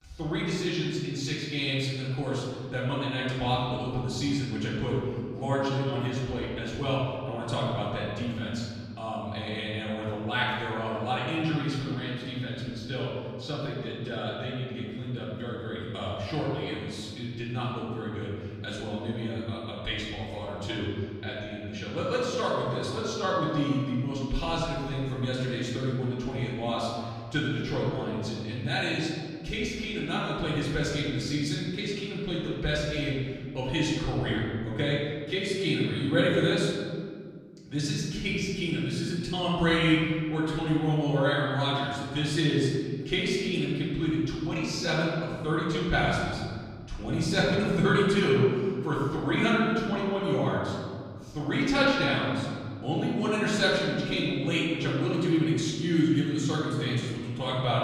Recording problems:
off-mic speech; far
room echo; noticeable; dies away in 1.9 s

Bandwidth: 15 kHz